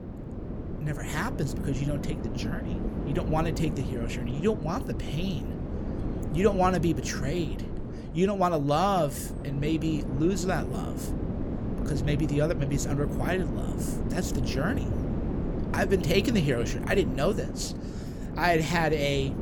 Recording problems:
wind noise on the microphone; heavy; 10 dB below the speech

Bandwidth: 18 kHz